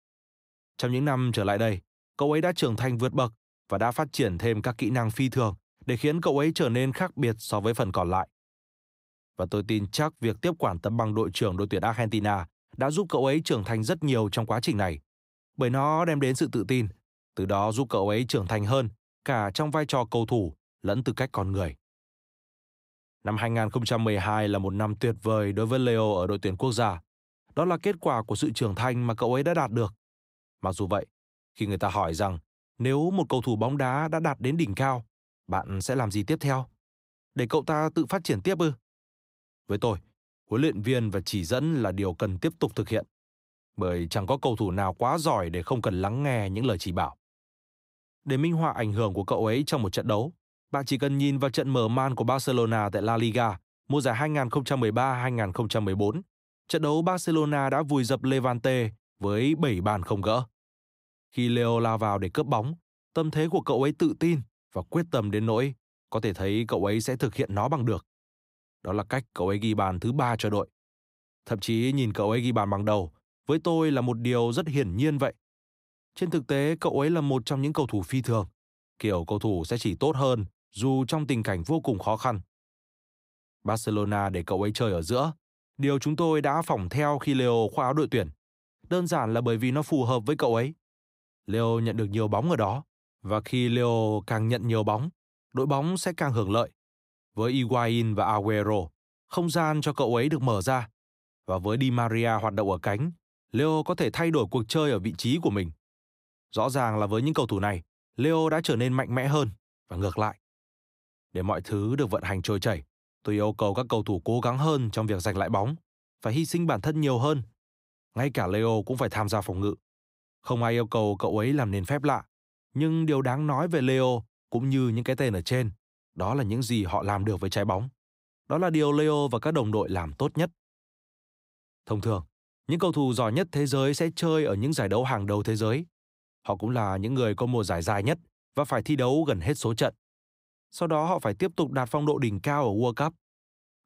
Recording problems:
none

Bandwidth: 15.5 kHz